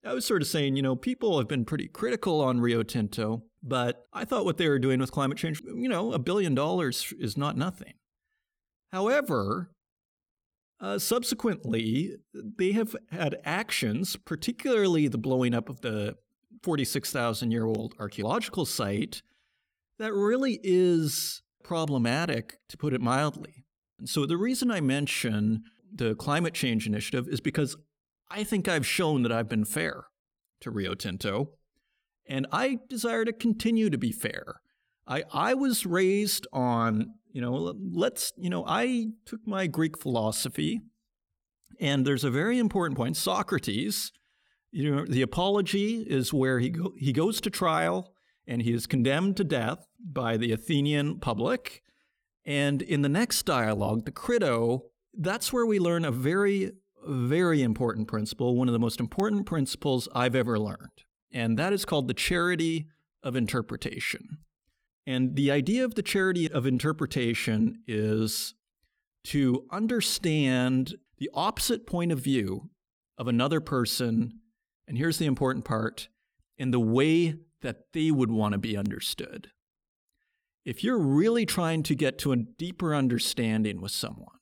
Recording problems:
none

